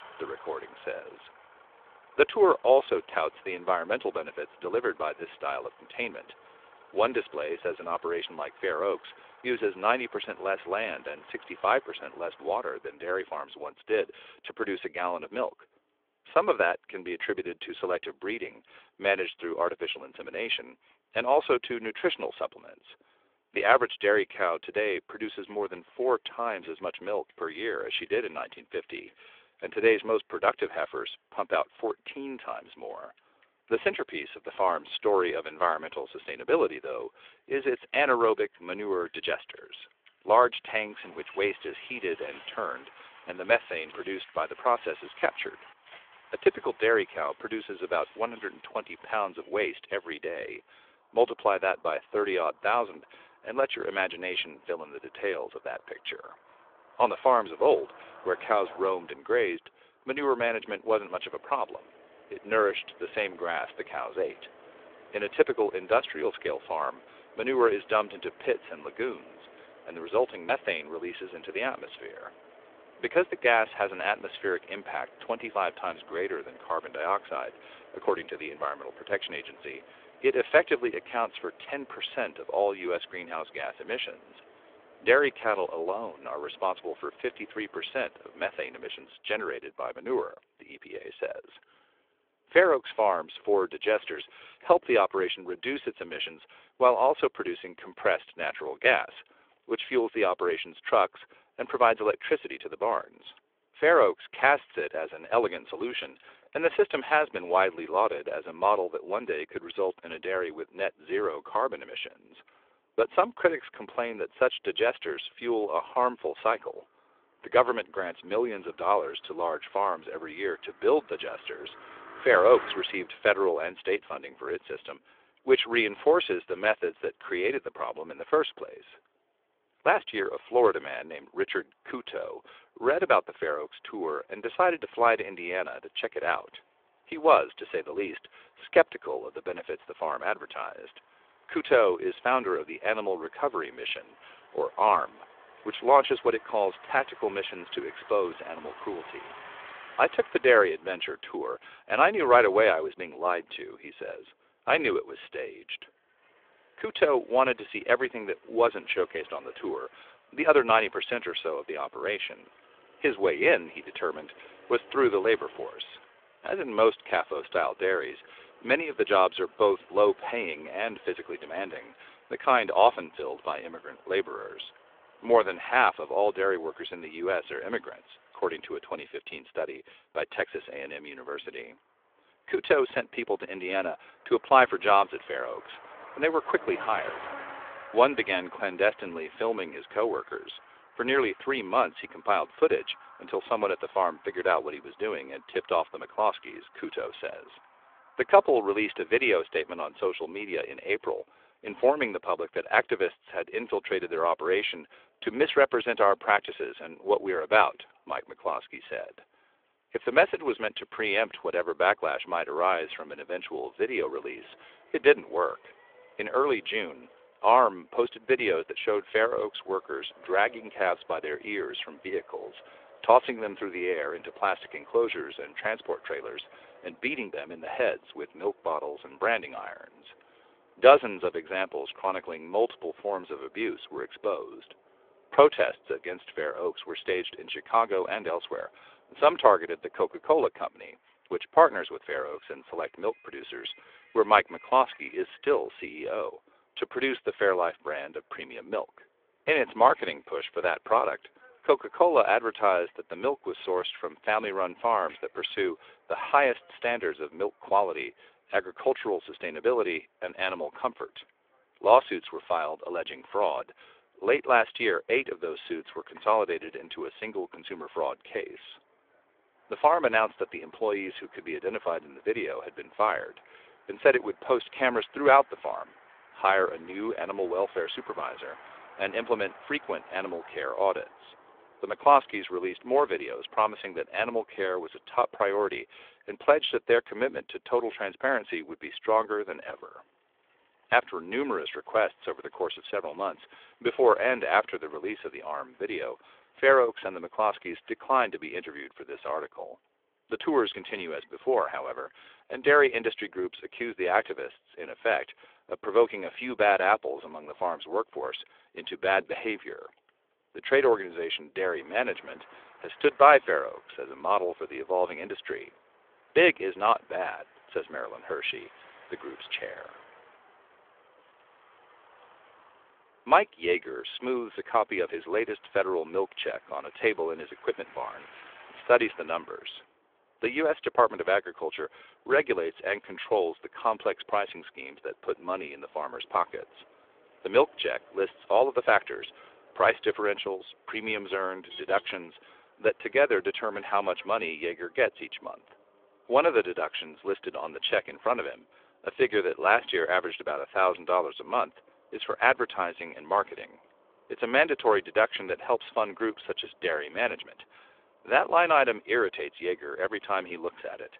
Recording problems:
phone-call audio; nothing above 3.5 kHz
traffic noise; faint; throughout; 25 dB below the speech

